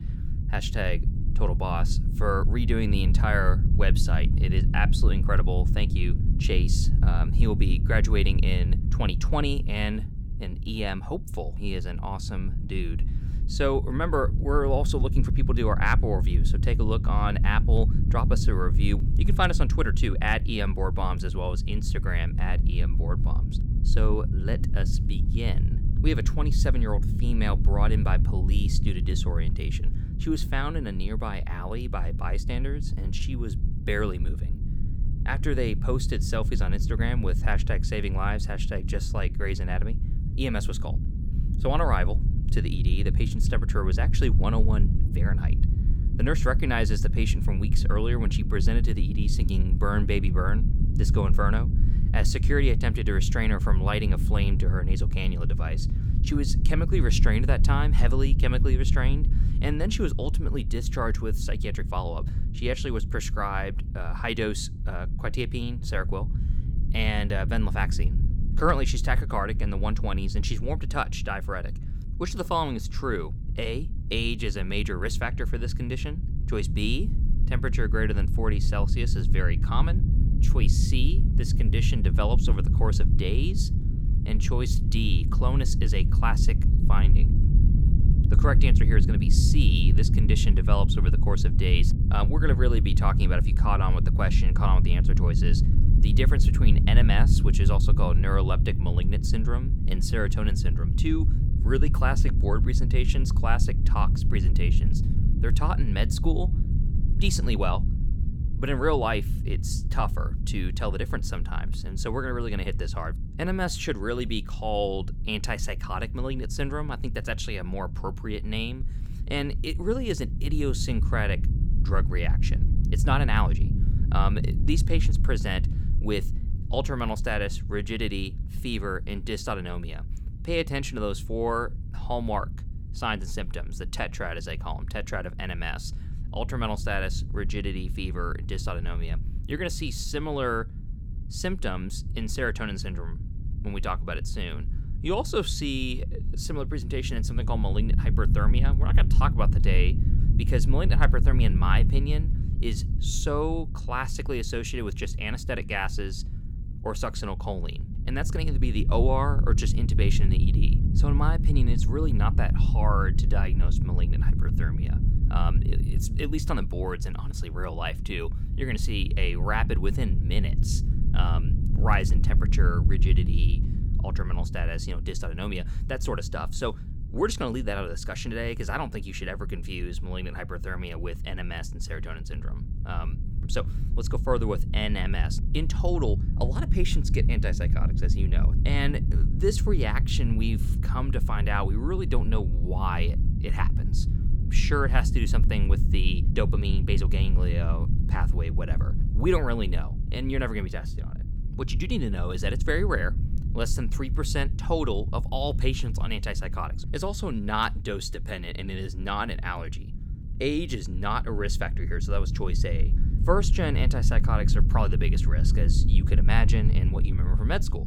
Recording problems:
low rumble; noticeable; throughout; 10 dB below the speech

